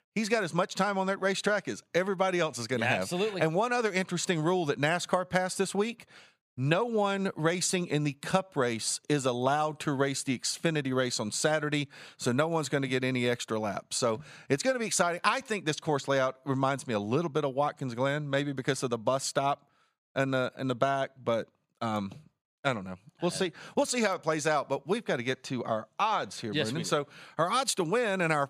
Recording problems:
none

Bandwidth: 15 kHz